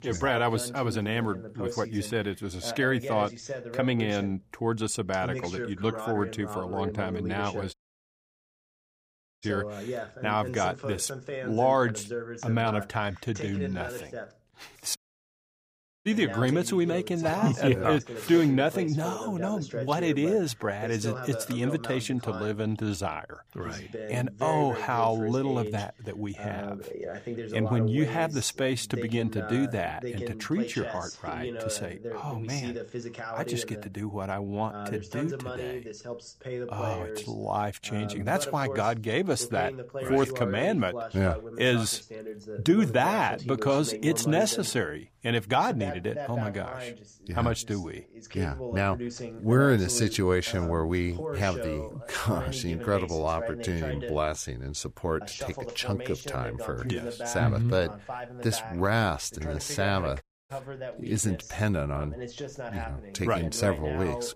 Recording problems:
voice in the background; loud; throughout; 9 dB below the speech
audio cutting out; at 7.5 s for 1.5 s, at 15 s for 1 s and at 1:00

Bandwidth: 15 kHz